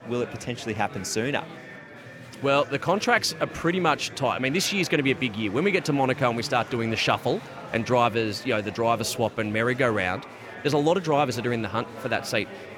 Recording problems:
murmuring crowd; noticeable; throughout; 15 dB below the speech

